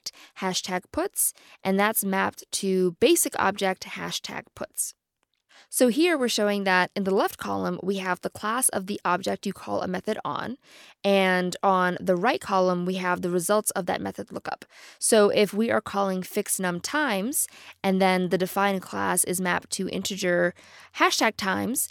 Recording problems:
none

